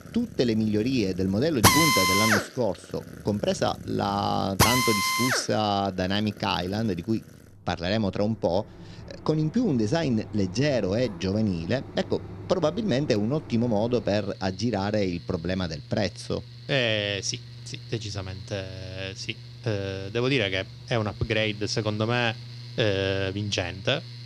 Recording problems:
machinery noise; loud; throughout; 1 dB below the speech

